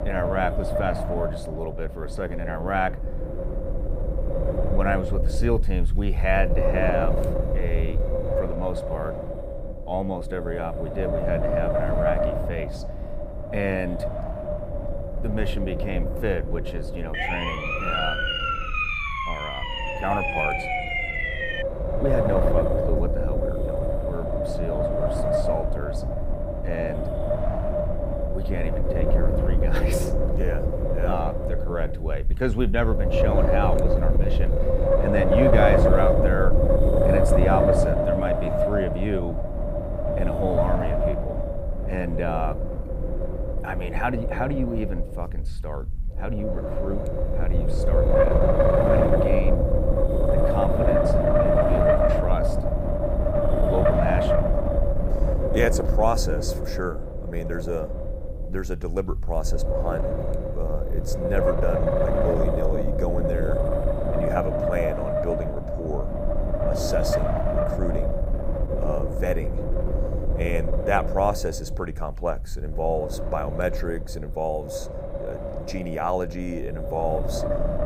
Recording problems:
wind noise on the microphone; heavy; 4 dB above the speech
siren; loud; from 17 to 22 s; peak 5 dB above the speech

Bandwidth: 15.5 kHz